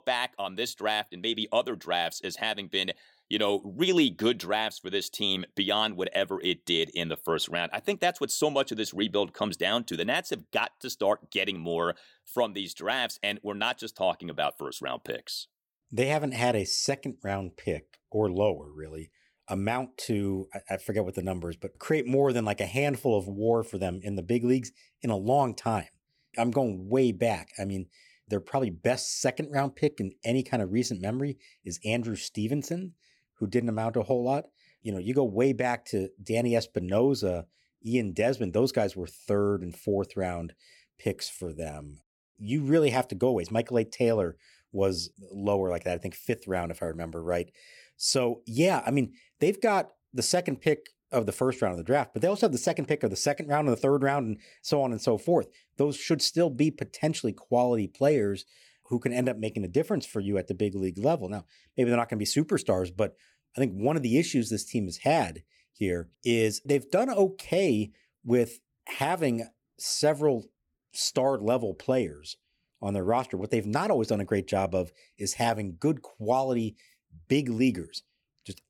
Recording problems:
none

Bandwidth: 17.5 kHz